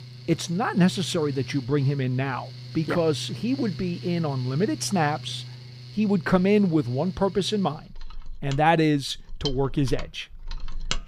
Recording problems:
machinery noise; noticeable; throughout; 15 dB below the speech

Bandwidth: 15 kHz